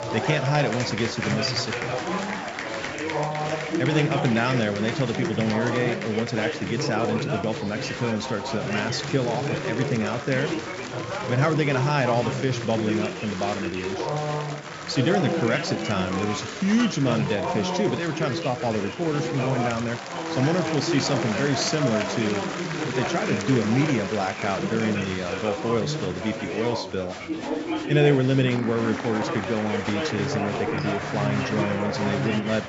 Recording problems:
high frequencies cut off; noticeable; nothing above 8 kHz
chatter from many people; loud; throughout; 3 dB below the speech

